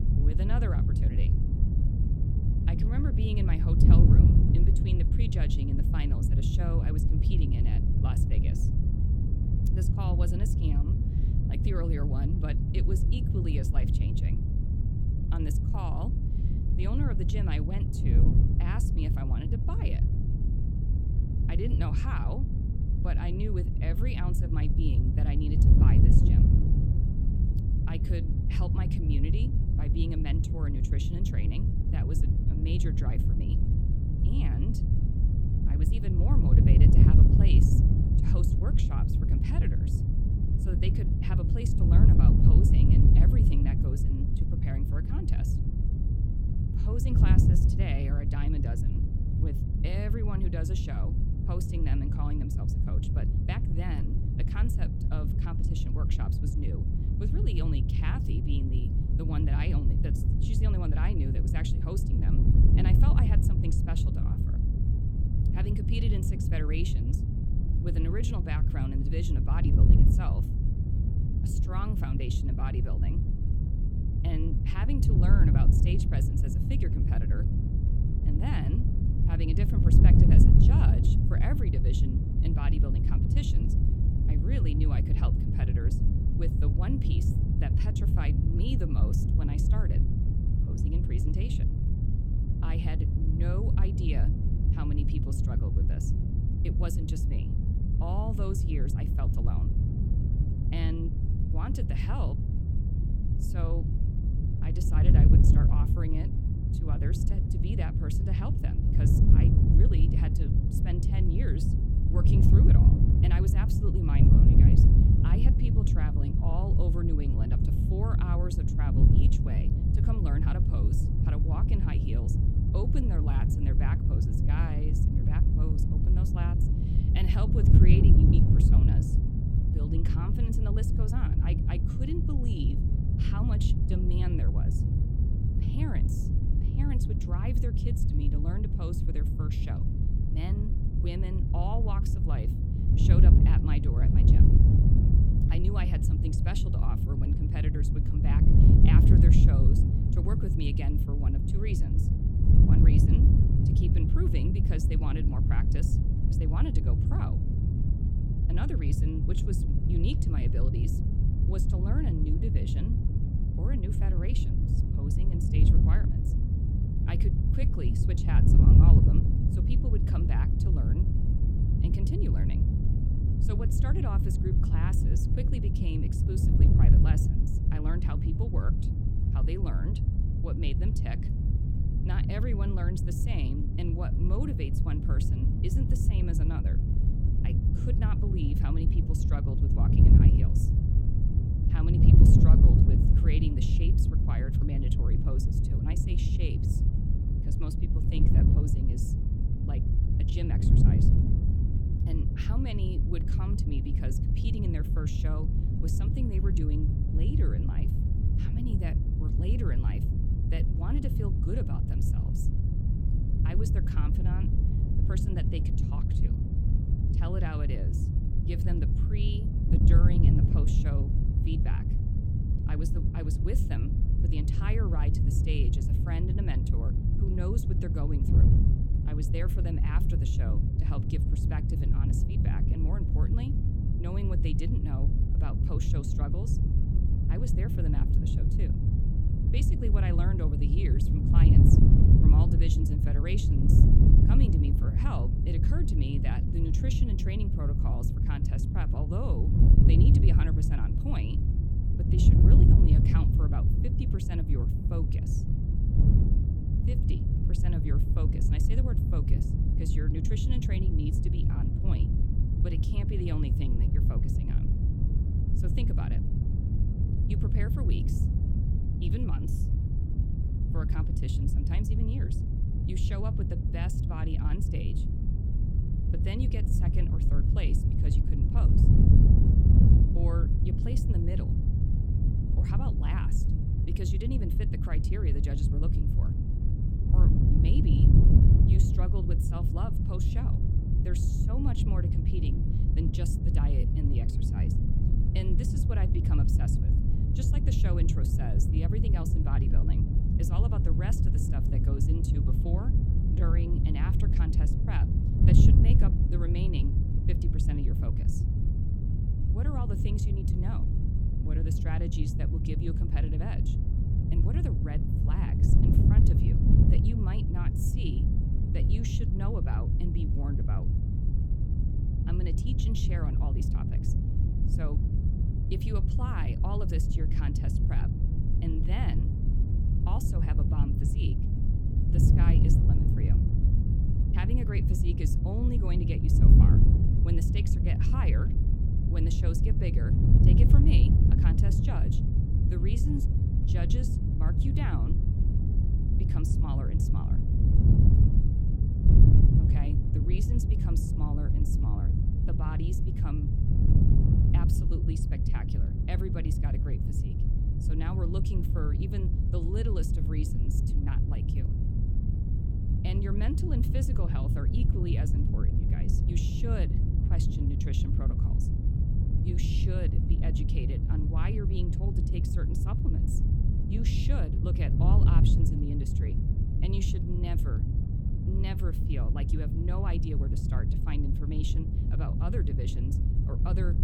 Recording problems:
wind noise on the microphone; heavy; 3 dB above the speech

